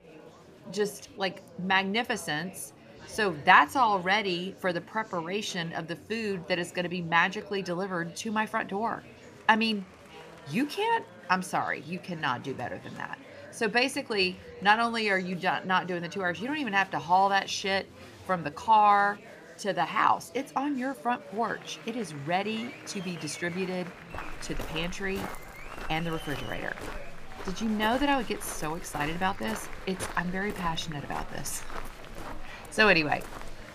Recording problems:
chatter from many people; noticeable; throughout; 20 dB below the speech
footsteps; faint; from 24 s on; peak 10 dB below the speech

